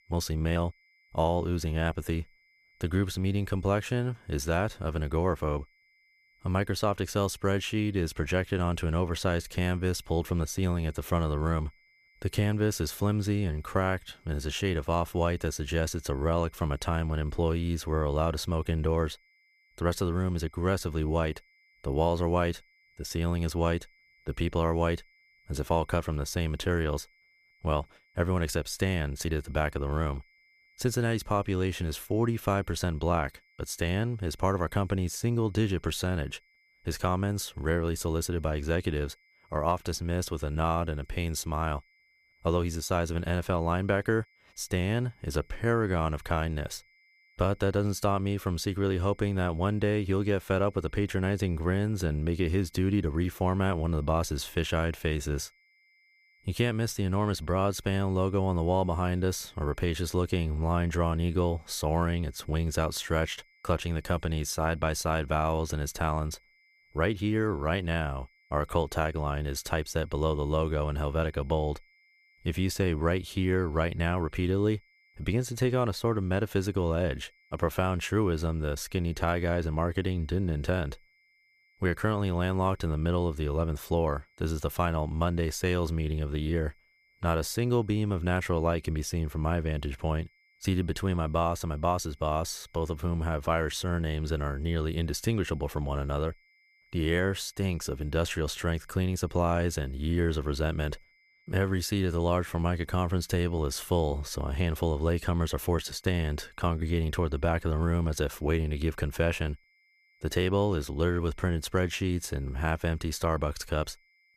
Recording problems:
high-pitched whine; faint; throughout; 2 kHz, 35 dB below the speech

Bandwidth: 14.5 kHz